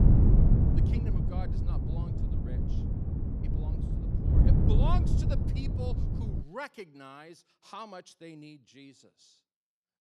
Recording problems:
wind noise on the microphone; heavy; until 6.5 s; 3 dB above the speech

